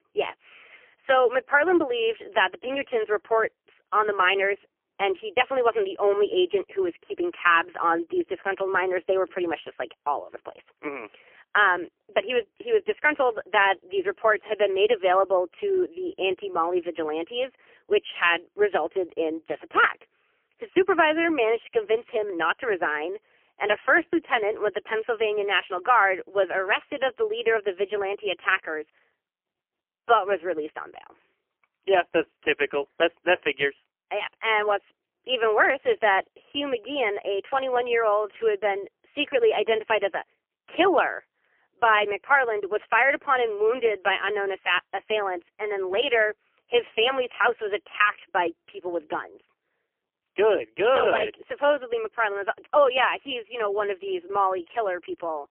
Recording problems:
phone-call audio; poor line; nothing above 3 kHz

